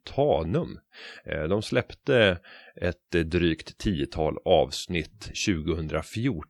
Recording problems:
none

